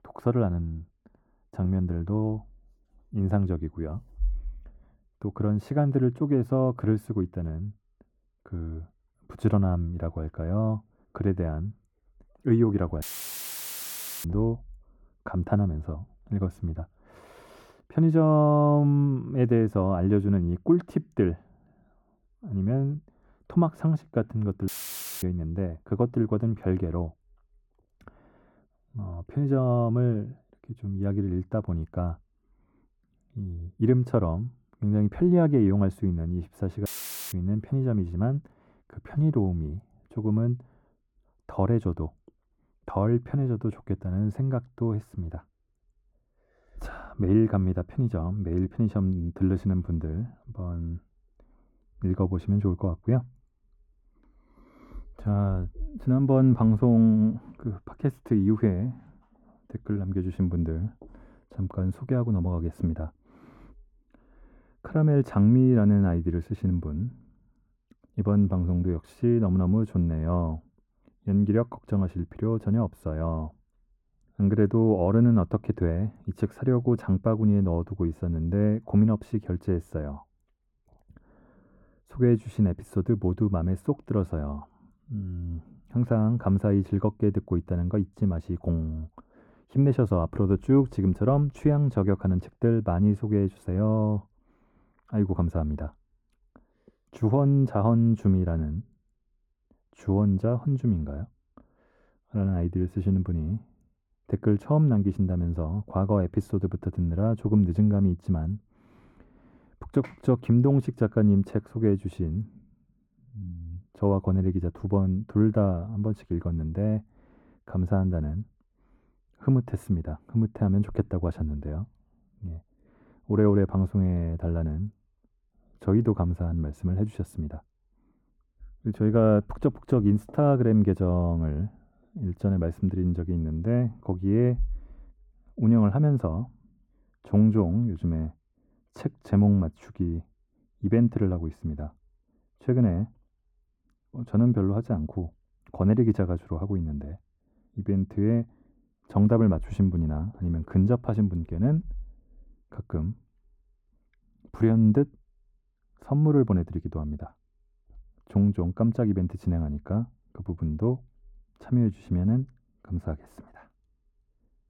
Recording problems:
muffled; very; fading above 2 kHz
audio cutting out; filled with static; at 13 s for 1 s, at 25 s for 0.5 s and at 37 s

